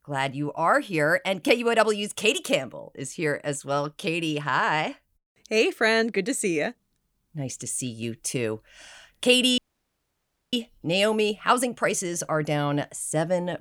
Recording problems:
audio cutting out; at 9.5 s for 1 s

